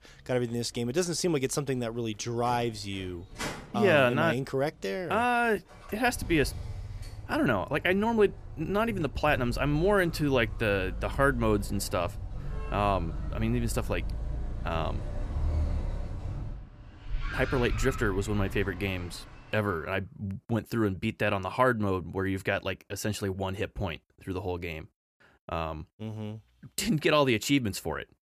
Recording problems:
traffic noise; loud; until 19 s; 10 dB below the speech

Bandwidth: 14.5 kHz